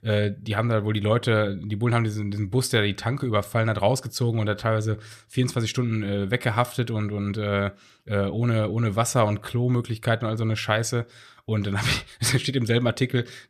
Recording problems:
none

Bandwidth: 14.5 kHz